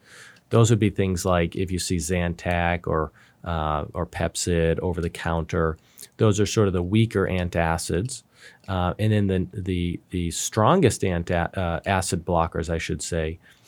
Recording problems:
none

